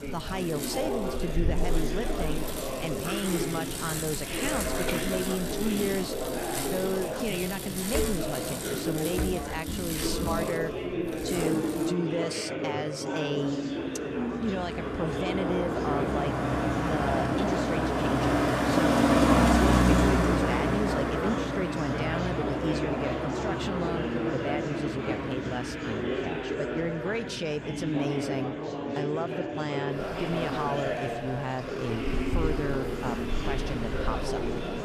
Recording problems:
traffic noise; very loud; throughout; 3 dB above the speech
chatter from many people; very loud; throughout; 1 dB above the speech

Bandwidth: 14.5 kHz